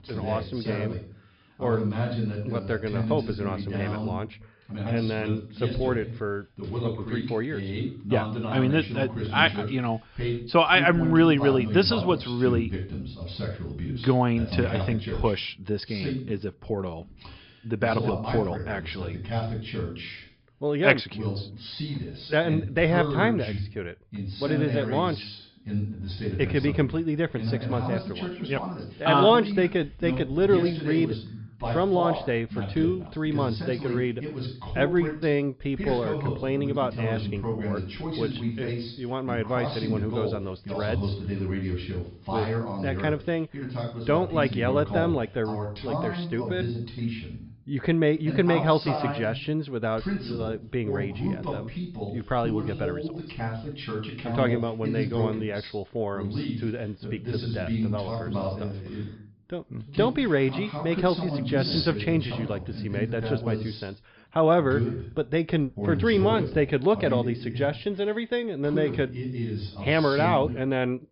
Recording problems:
high frequencies cut off; noticeable; nothing above 5 kHz
voice in the background; loud; throughout; 6 dB below the speech

